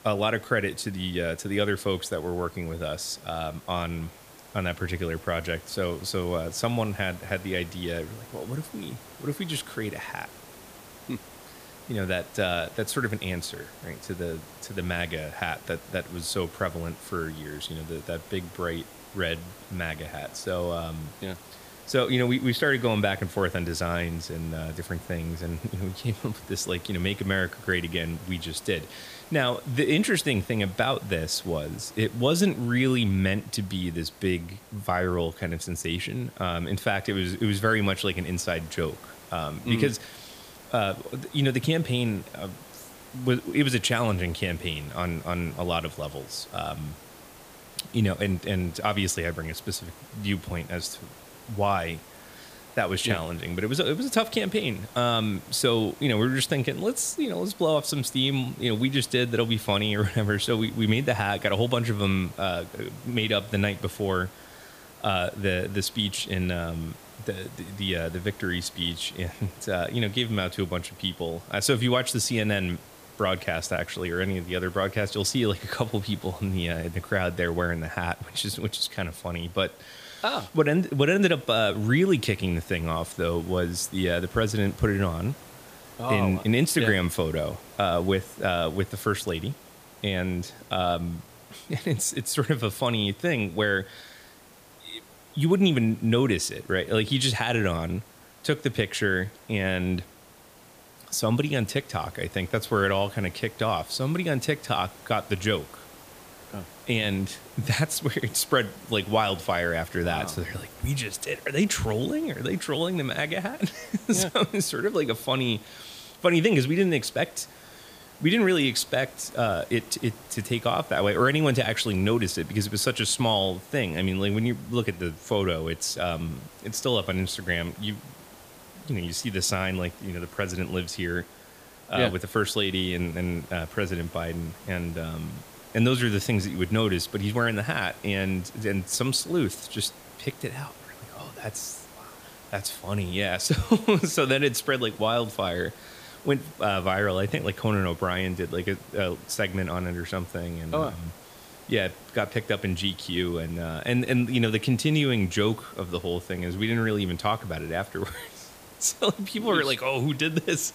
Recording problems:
hiss; noticeable; throughout; 20 dB below the speech

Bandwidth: 15 kHz